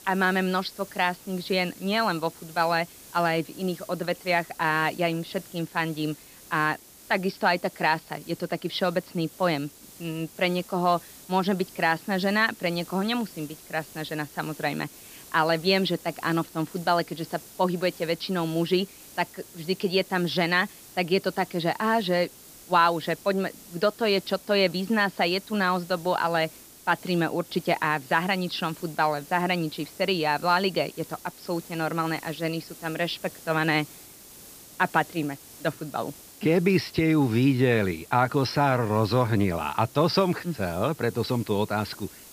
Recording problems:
high frequencies cut off; noticeable; nothing above 5.5 kHz
hiss; noticeable; throughout; 20 dB below the speech

